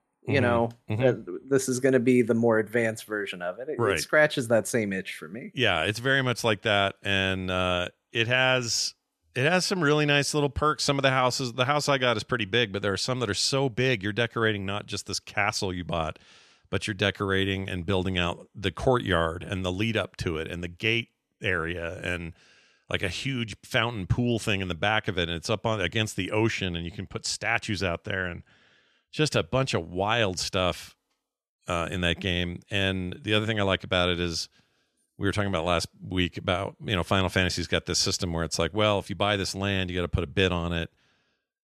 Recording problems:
none

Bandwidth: 13.5 kHz